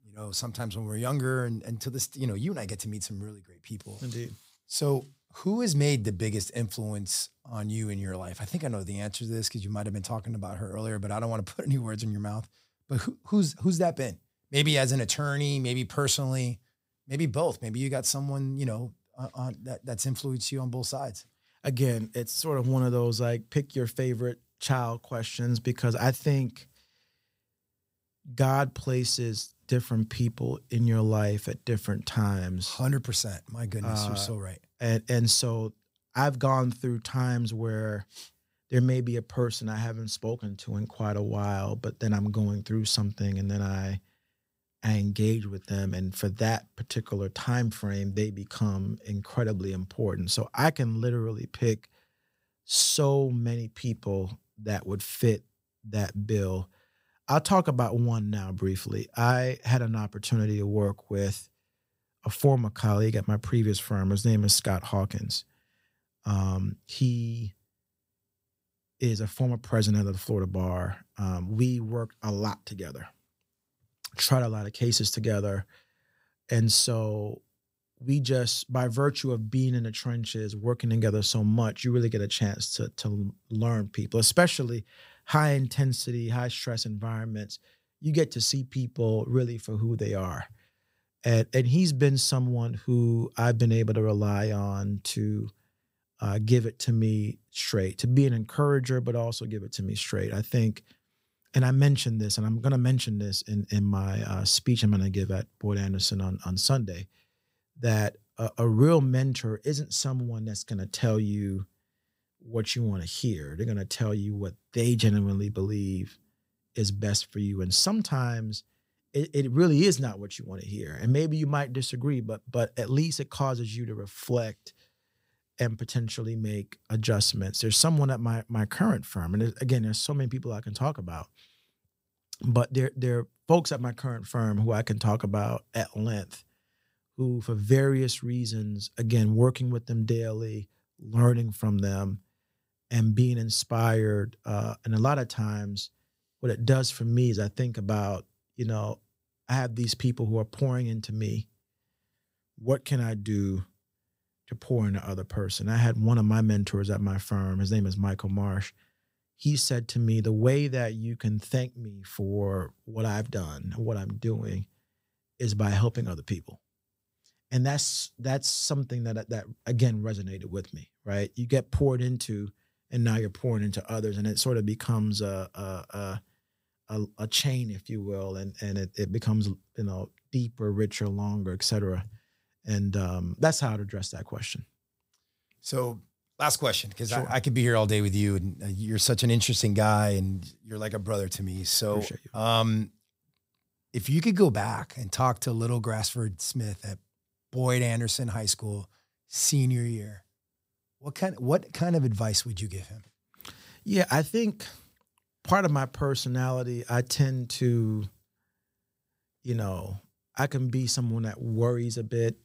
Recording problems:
none

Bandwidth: 15.5 kHz